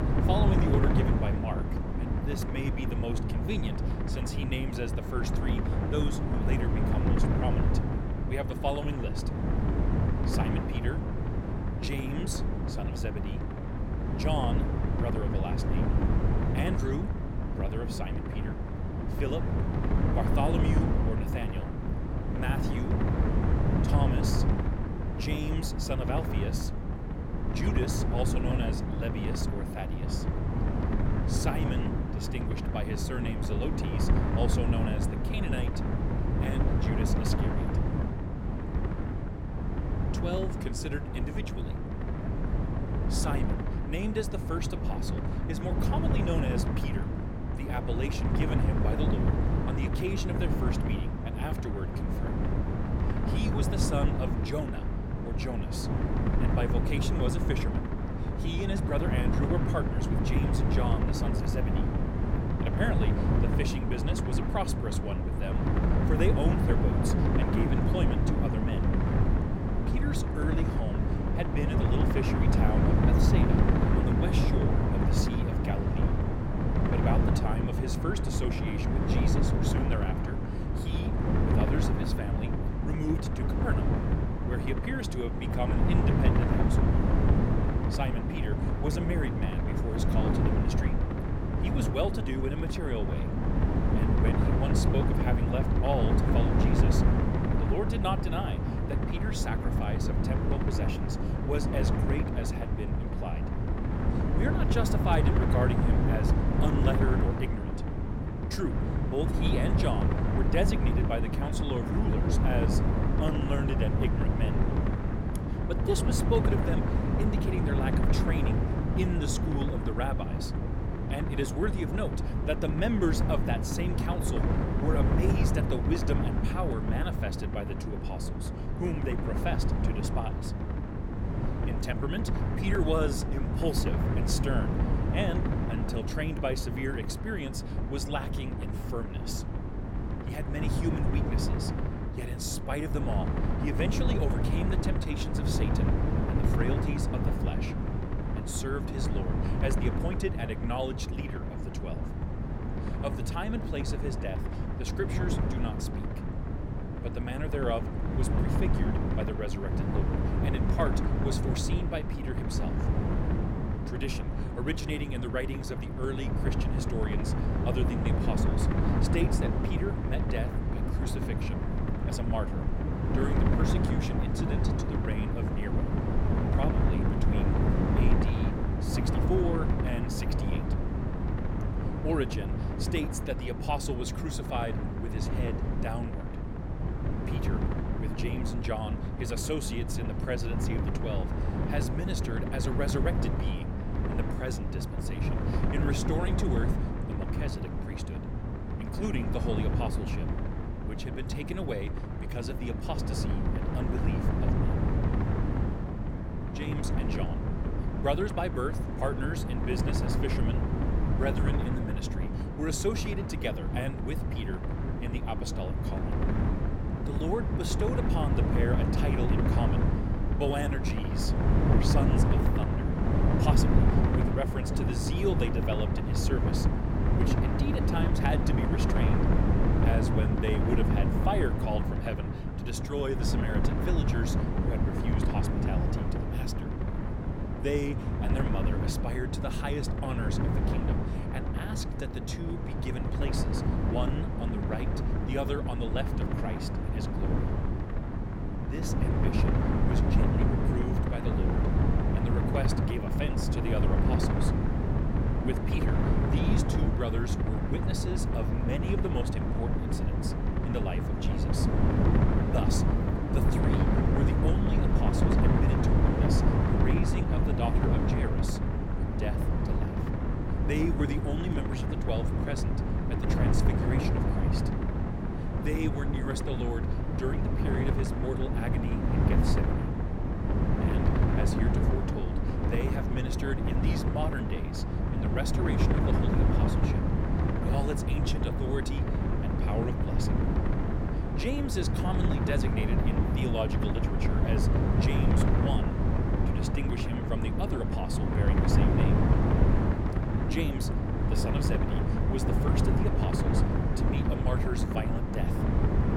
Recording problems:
wind noise on the microphone; heavy; 1 dB above the speech

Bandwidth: 16.5 kHz